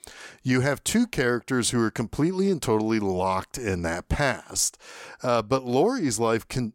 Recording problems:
none

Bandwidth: 16 kHz